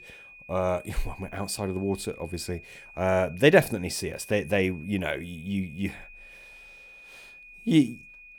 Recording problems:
high-pitched whine; noticeable; throughout; 2.5 kHz, 20 dB below the speech

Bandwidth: 18 kHz